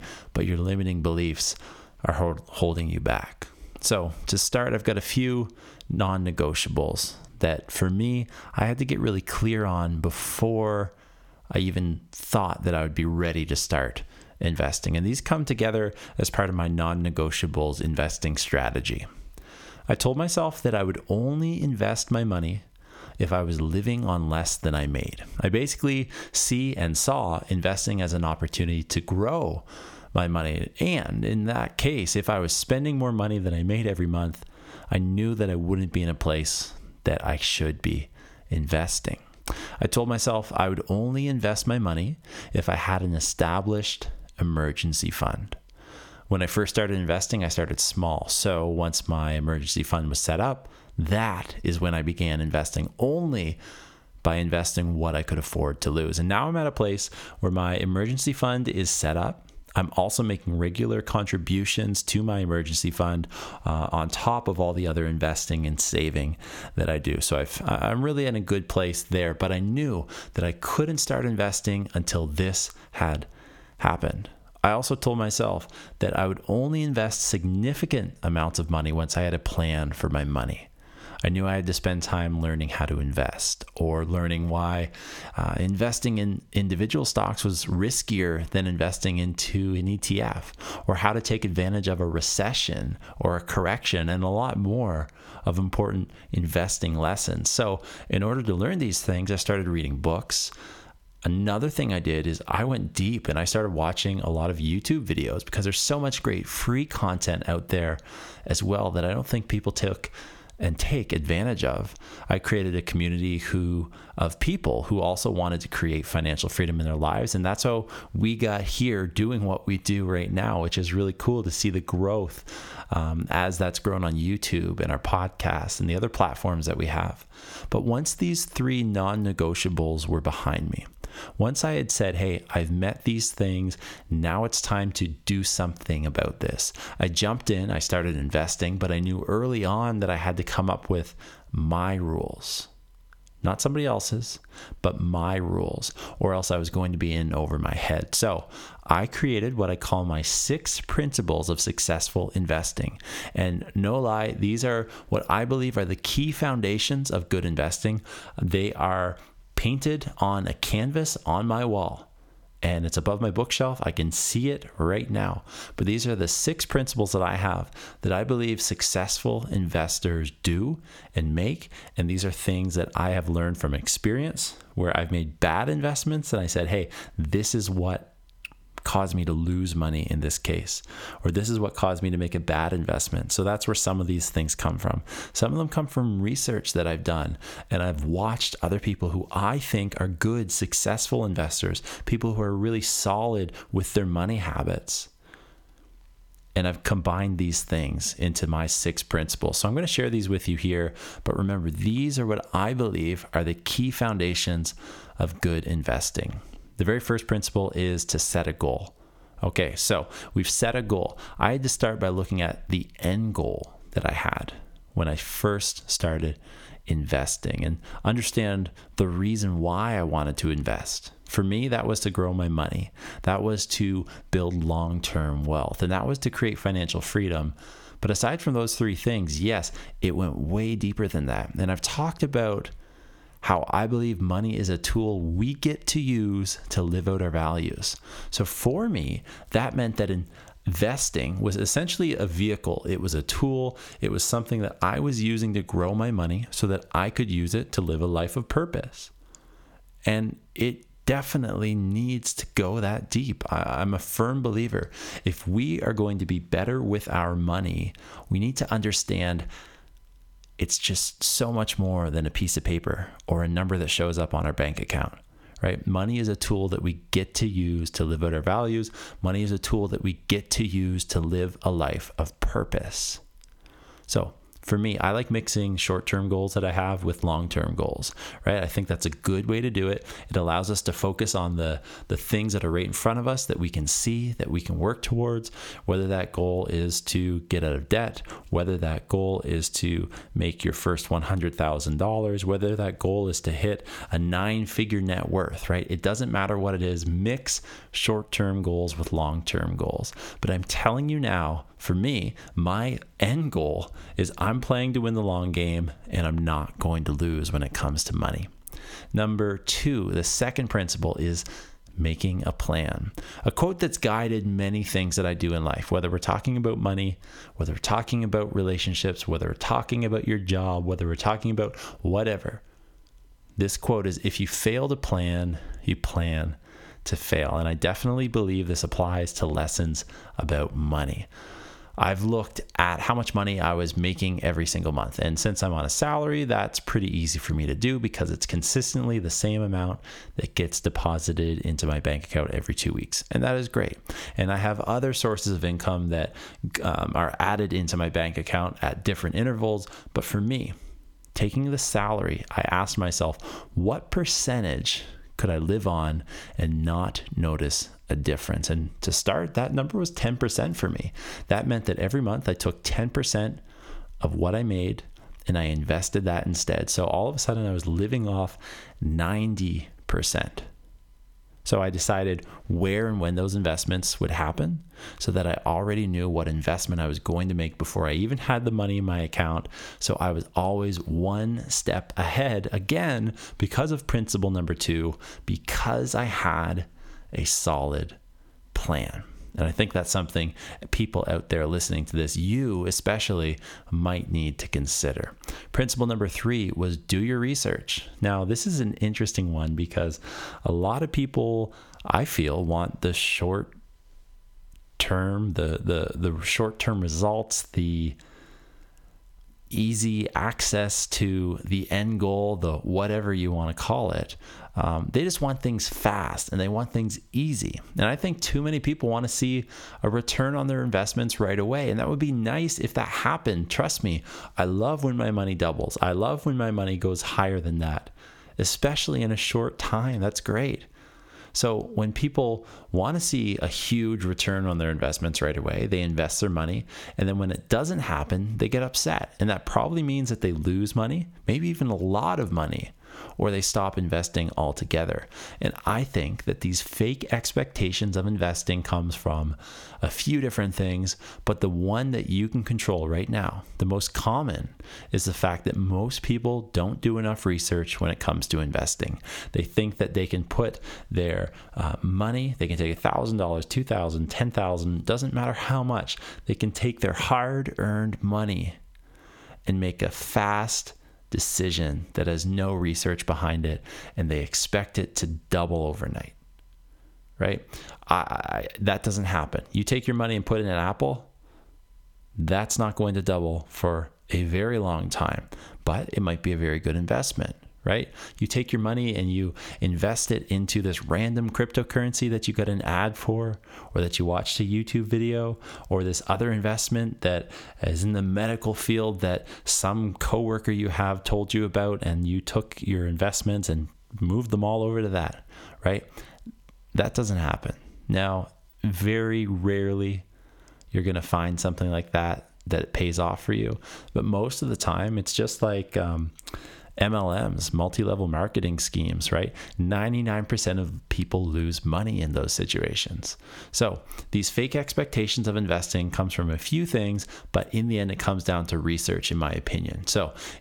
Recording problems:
squashed, flat; somewhat

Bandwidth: 18.5 kHz